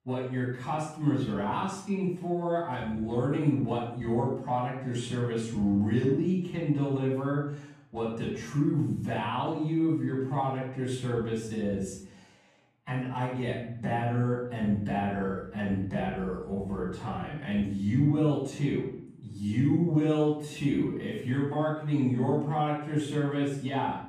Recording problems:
off-mic speech; far
wrong speed, natural pitch; too slow; 0.6 times normal speed
room echo; noticeable; dies away in 0.5 s

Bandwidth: 15 kHz